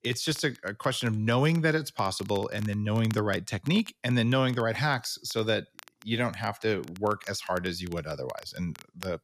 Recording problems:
crackle, like an old record; faint; 20 dB below the speech

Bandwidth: 14.5 kHz